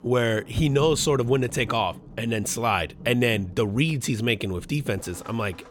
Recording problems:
rain or running water; noticeable; throughout; 20 dB below the speech

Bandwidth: 18 kHz